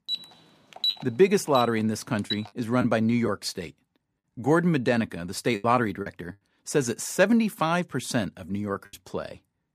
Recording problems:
choppy; occasionally; 4% of the speech affected
alarm; noticeable; until 2.5 s; peak 1 dB below the speech

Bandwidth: 15 kHz